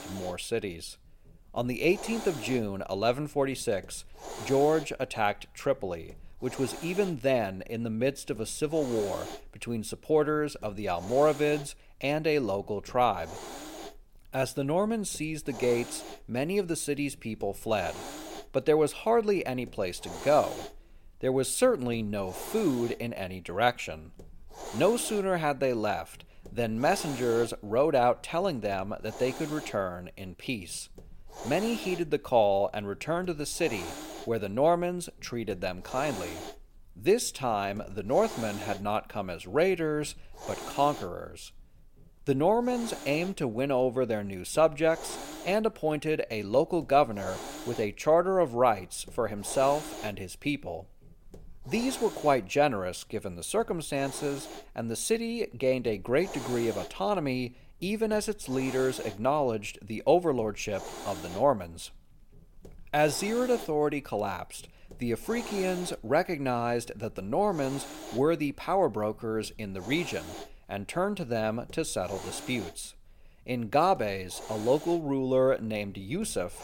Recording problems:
hiss; noticeable; throughout; 15 dB below the speech

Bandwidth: 16.5 kHz